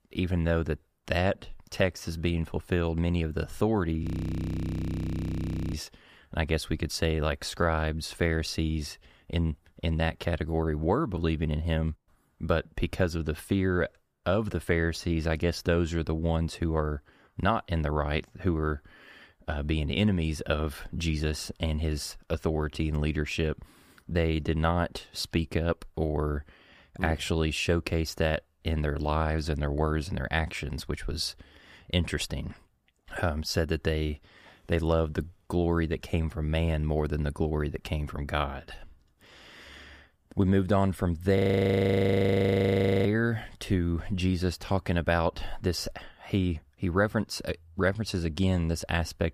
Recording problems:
audio freezing; at 4 s for 1.5 s and at 41 s for 1.5 s

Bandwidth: 15 kHz